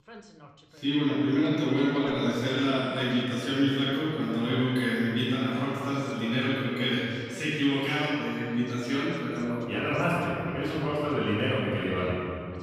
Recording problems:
room echo; strong; dies away in 2.2 s
off-mic speech; far
voice in the background; faint; throughout; 20 dB below the speech

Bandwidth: 15 kHz